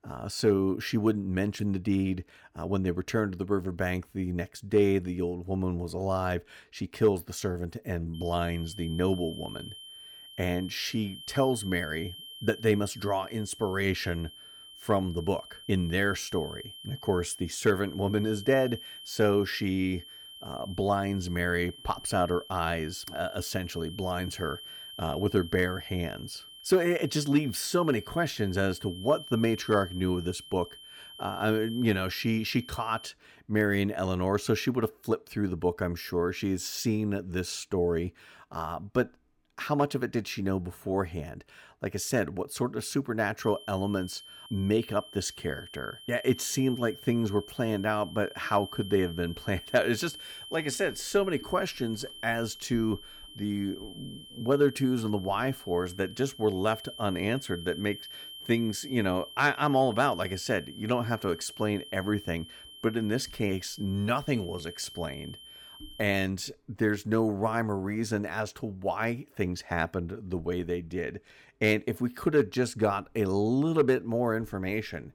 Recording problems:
high-pitched whine; noticeable; from 8 to 33 s and from 43 s to 1:06; 3 kHz, 15 dB below the speech

